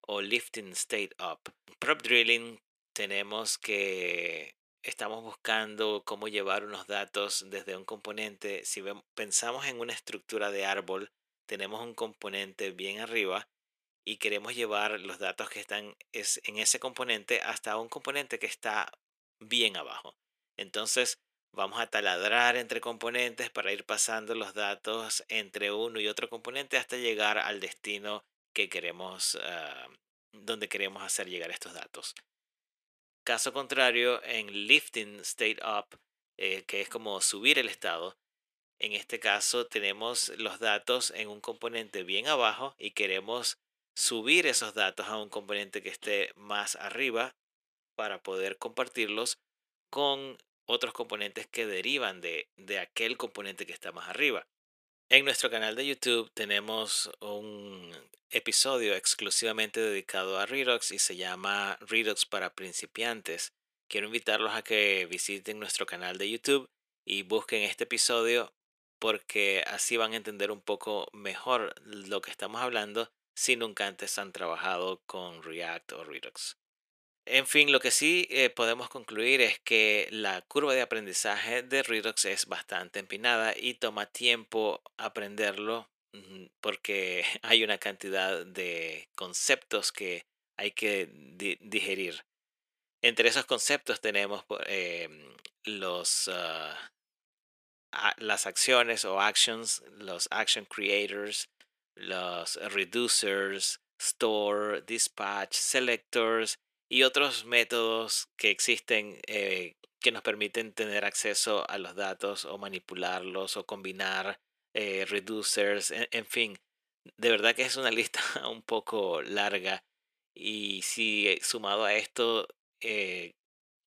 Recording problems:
thin; very; fading below 400 Hz

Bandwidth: 14.5 kHz